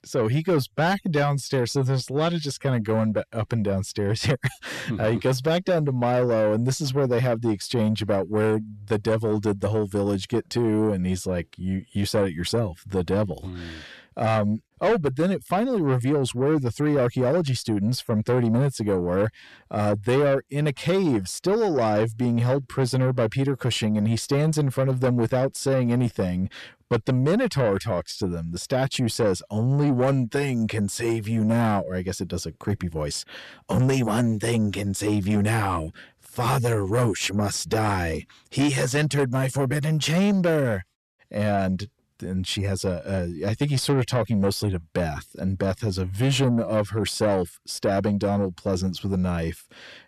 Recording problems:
distortion; slight; 10 dB below the speech

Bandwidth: 13.5 kHz